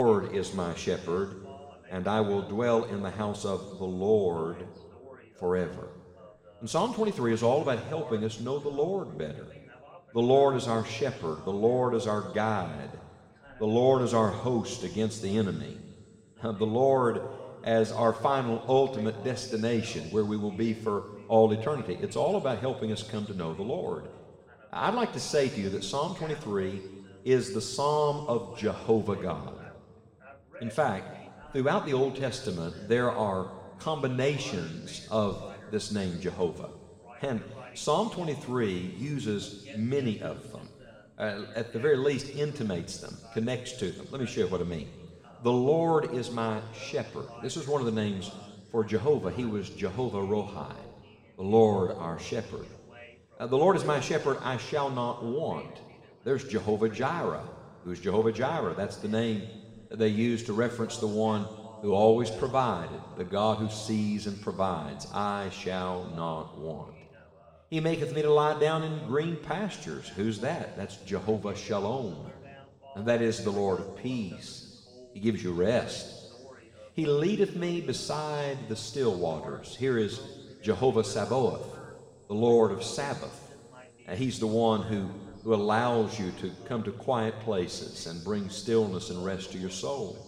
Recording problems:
room echo; noticeable; dies away in 2 s
off-mic speech; somewhat distant
voice in the background; faint; throughout; 25 dB below the speech
abrupt cut into speech; at the start

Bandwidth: 16 kHz